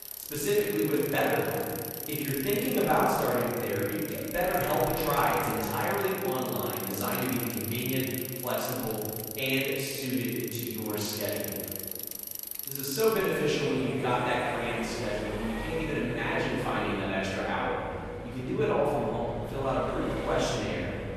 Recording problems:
echo of what is said; strong; throughout; 180 ms later, 10 dB below the speech
room echo; strong; dies away in 1.8 s
off-mic speech; far
garbled, watery; slightly; nothing above 13 kHz
traffic noise; loud; throughout; 8 dB below the speech

